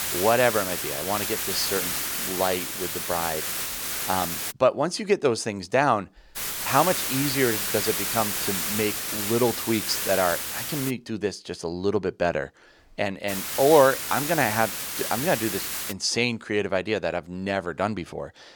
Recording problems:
hiss; loud; until 4.5 s, from 6.5 to 11 s and from 13 to 16 s; 2 dB below the speech

